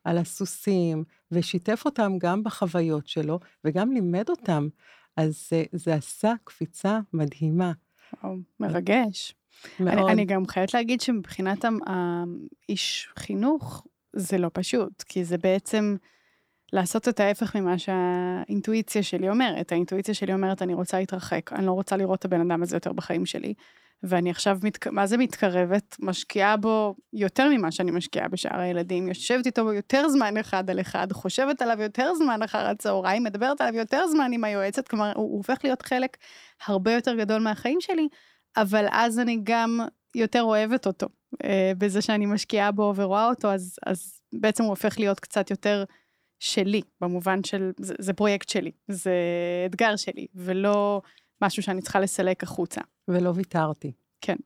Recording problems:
none

